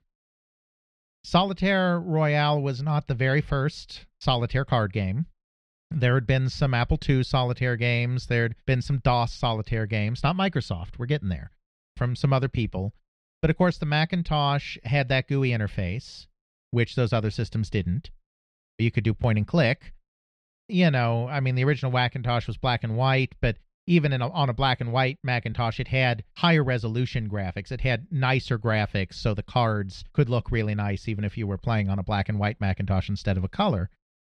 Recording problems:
muffled; slightly; fading above 2.5 kHz

